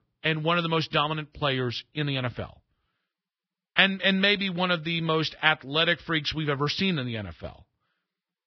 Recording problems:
garbled, watery; badly; nothing above 5.5 kHz

